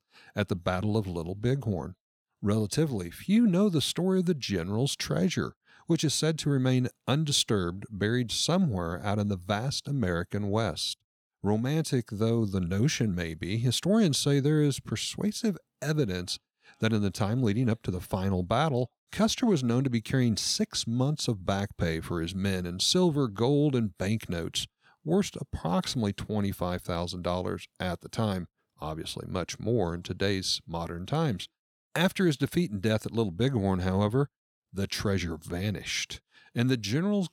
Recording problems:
none

